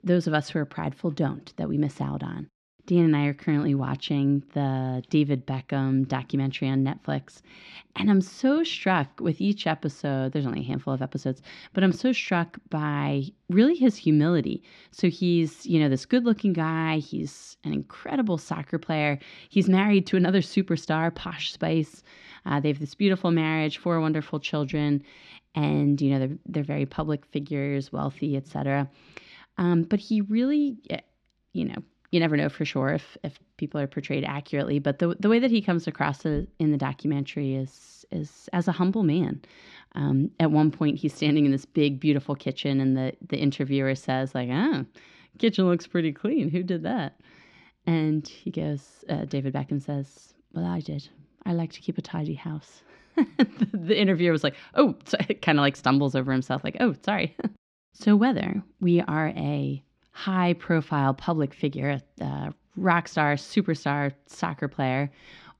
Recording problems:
muffled; very slightly; fading above 3 kHz

